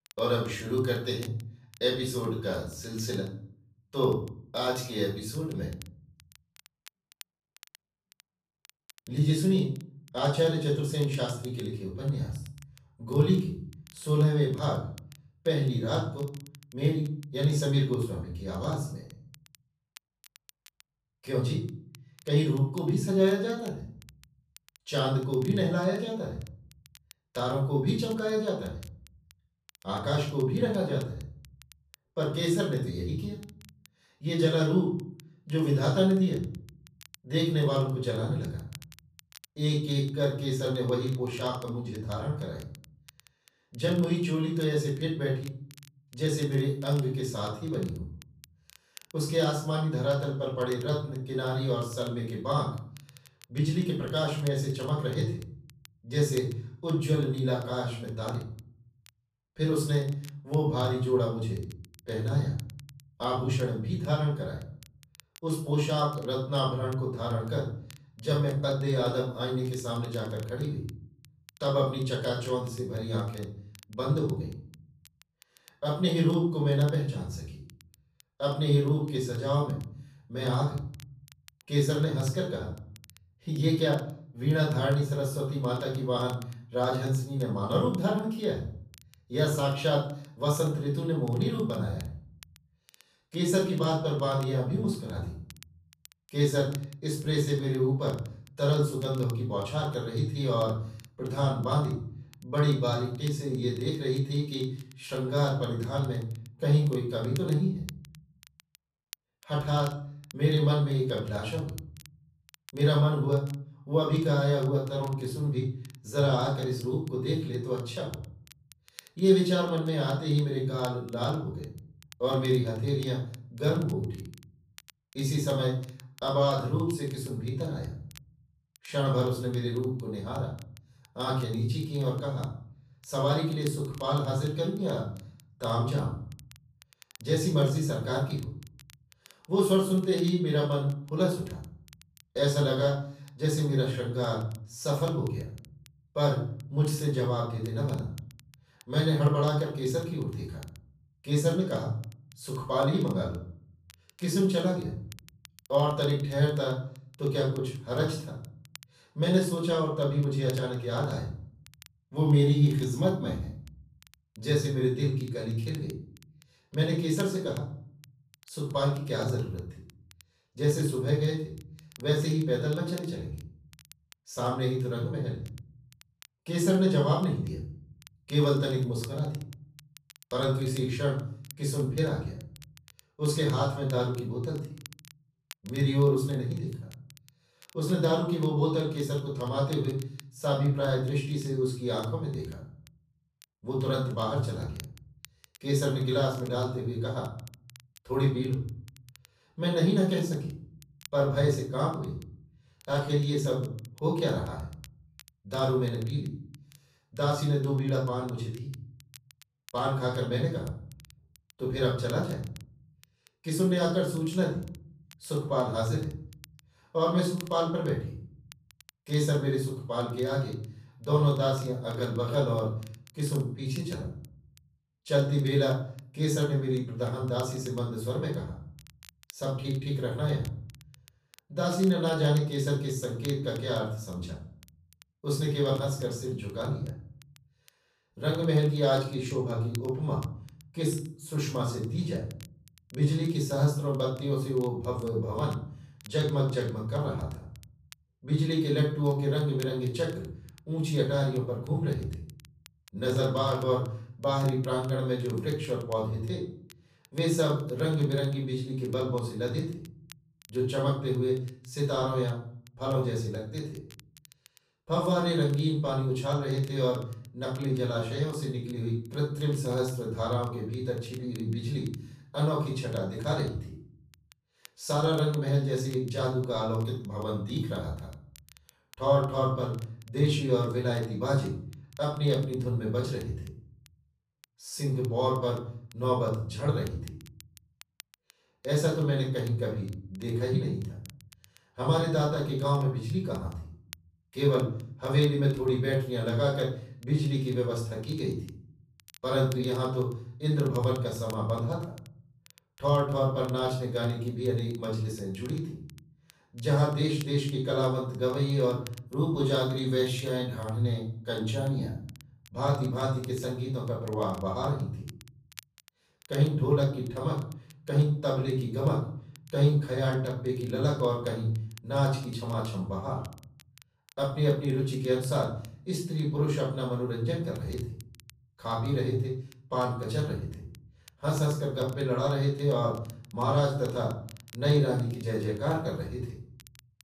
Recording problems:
off-mic speech; far
room echo; noticeable; dies away in 0.5 s
crackle, like an old record; faint; 25 dB below the speech

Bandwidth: 14.5 kHz